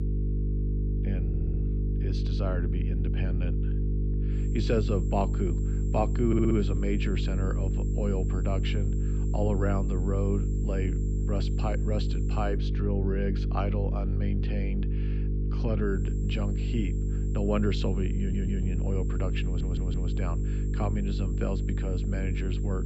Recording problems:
muffled; slightly; fading above 3.5 kHz
electrical hum; loud; throughout; 50 Hz, 6 dB below the speech
high-pitched whine; faint; from 4.5 to 13 s and from 16 s on; 7.5 kHz, 20 dB below the speech
audio stuttering; 4 times, first at 1.5 s

